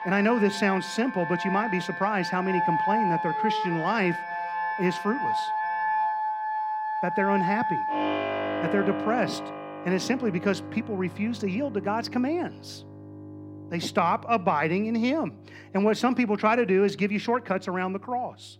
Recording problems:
background music; loud; throughout; 3 dB below the speech

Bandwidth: 16.5 kHz